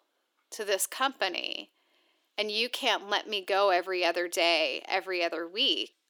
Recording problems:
thin; very; fading below 300 Hz

